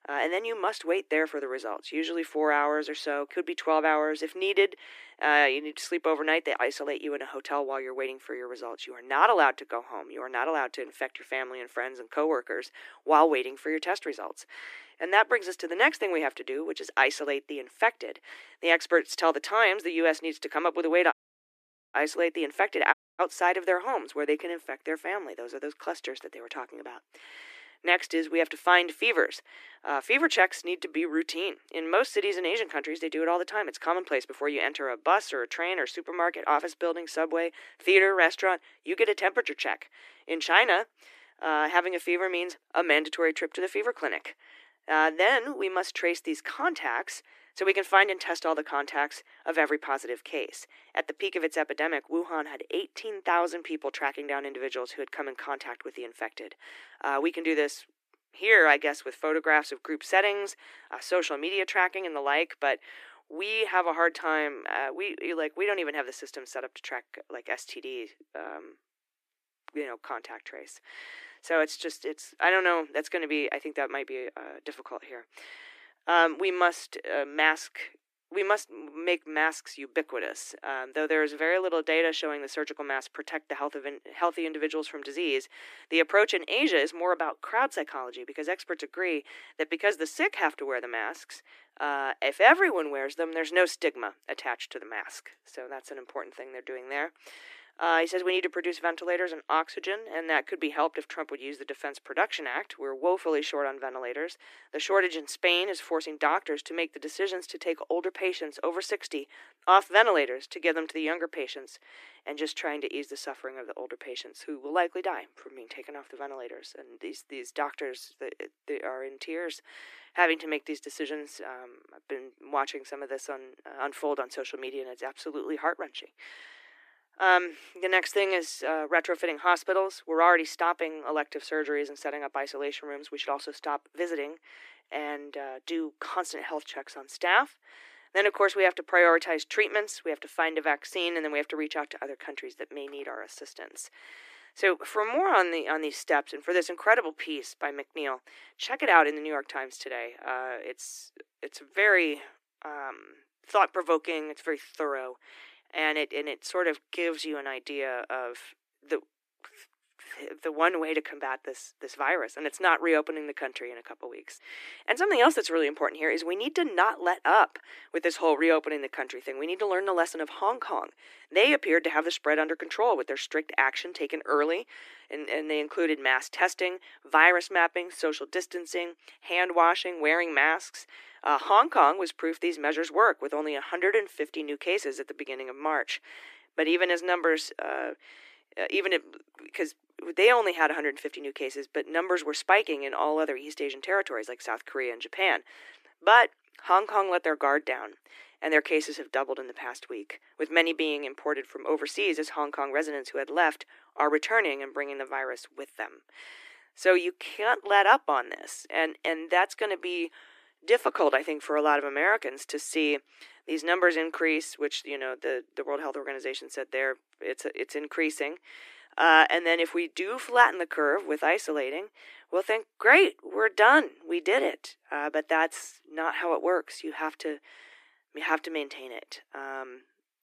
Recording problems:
thin; very; fading below 300 Hz
audio cutting out; at 21 s for 1 s and at 23 s

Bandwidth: 14.5 kHz